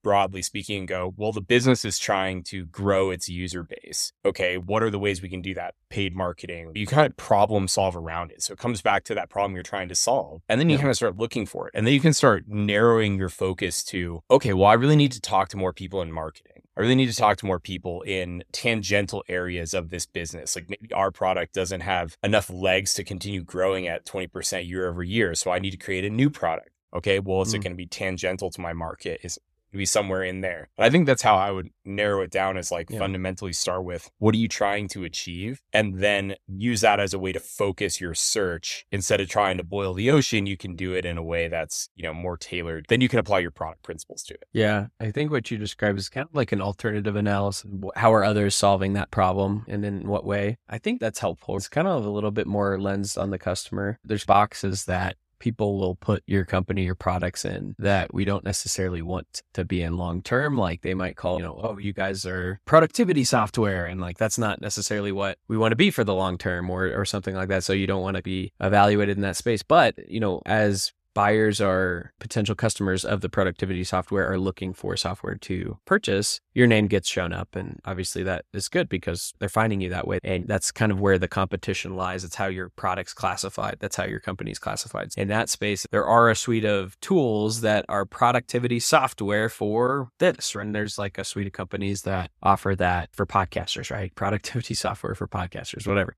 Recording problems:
none

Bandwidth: 14 kHz